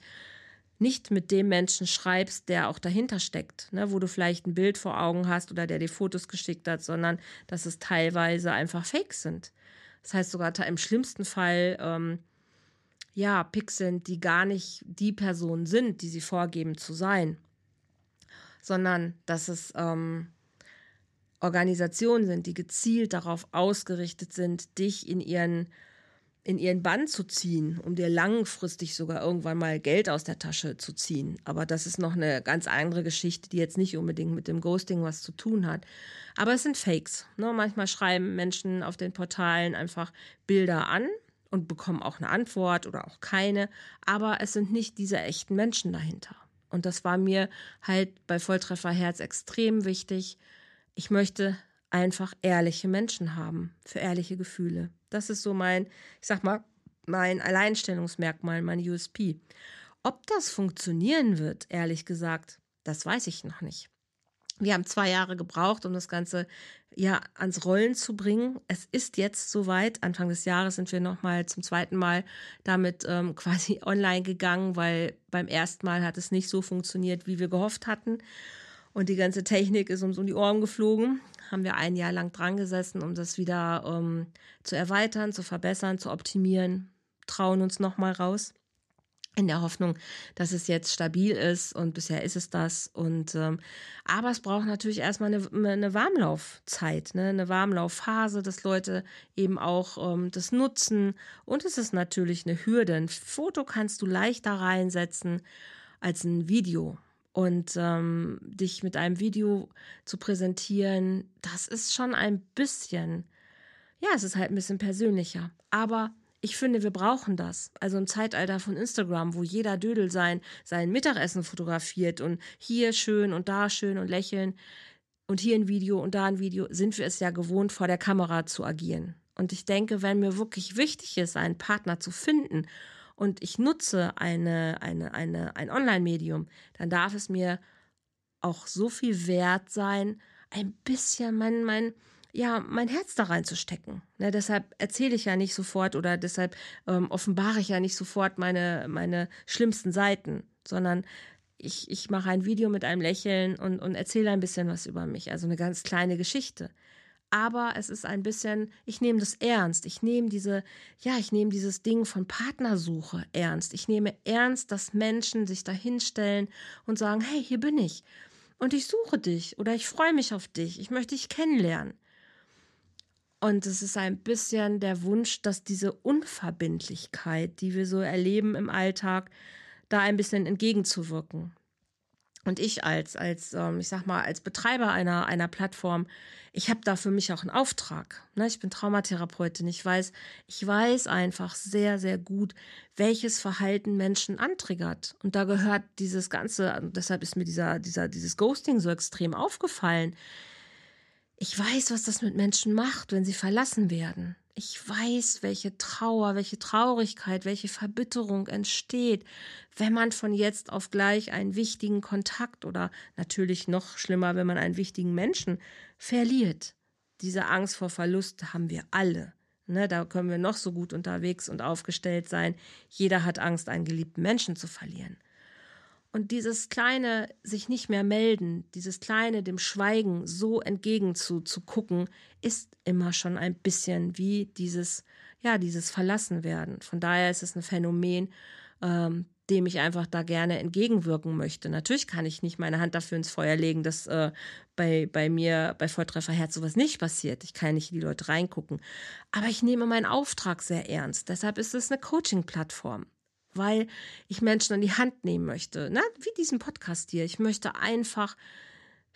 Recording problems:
none

